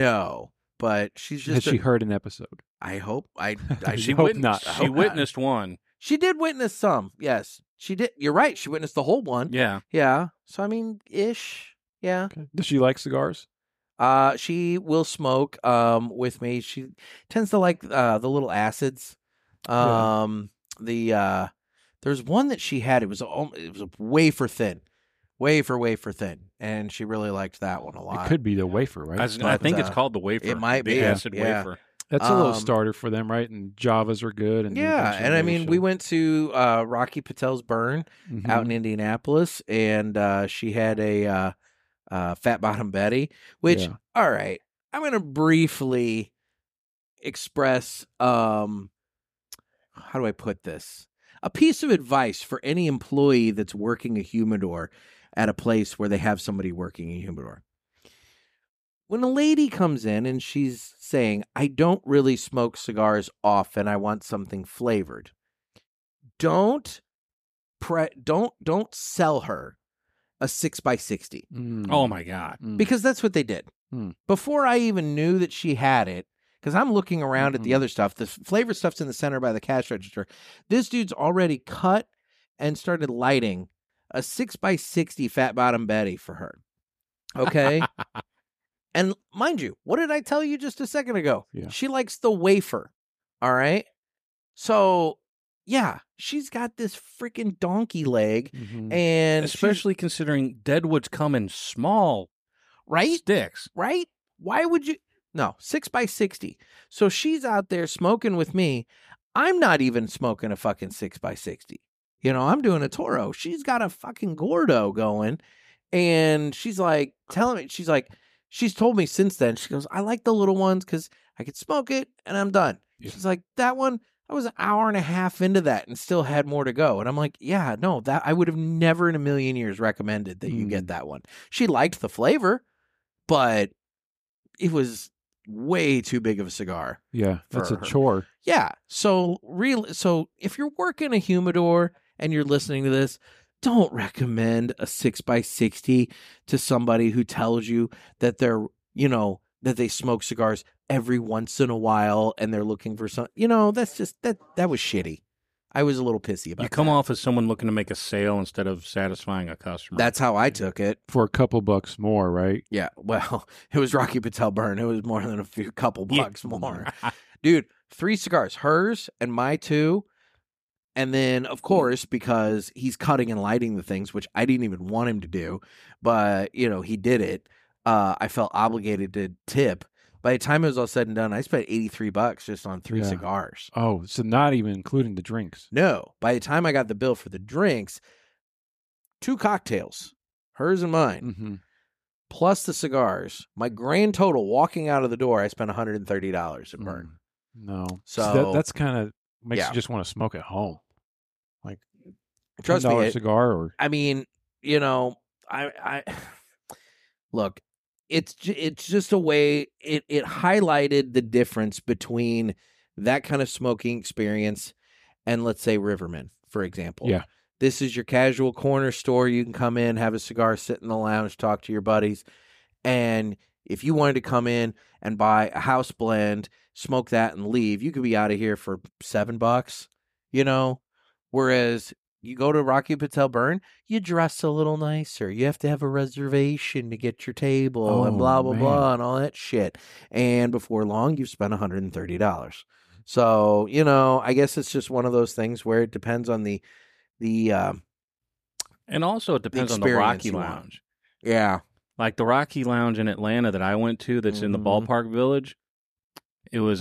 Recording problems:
abrupt cut into speech; at the start and the end

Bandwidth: 15 kHz